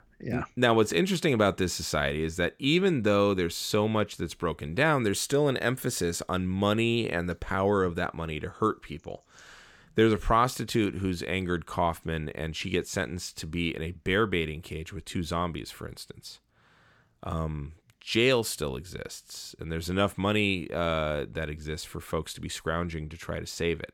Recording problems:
none

